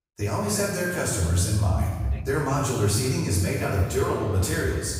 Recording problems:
off-mic speech; far
room echo; noticeable; dies away in 1.3 s
echo of what is said; faint; from 3.5 s on; 240 ms later, 20 dB below the speech
voice in the background; faint; throughout; 20 dB below the speech

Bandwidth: 15.5 kHz